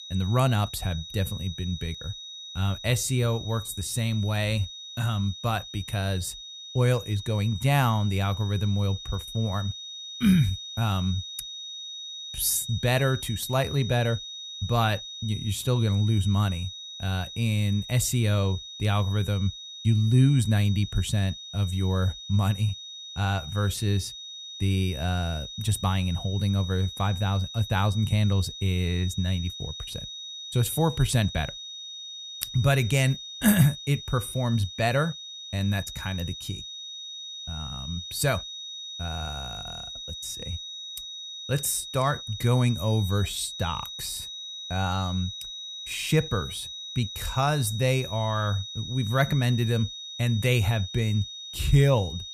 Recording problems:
high-pitched whine; noticeable; throughout; 3.5 kHz, 10 dB below the speech

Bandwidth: 14.5 kHz